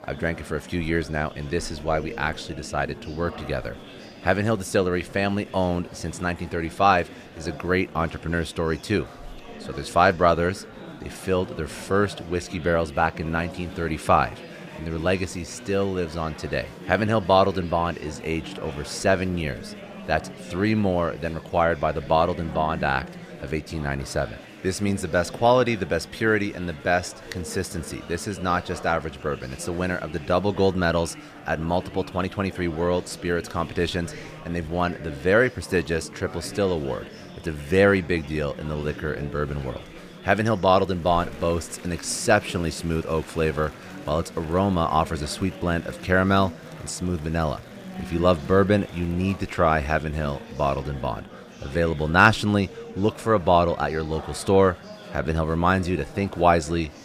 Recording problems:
murmuring crowd; noticeable; throughout; 15 dB below the speech

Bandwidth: 15 kHz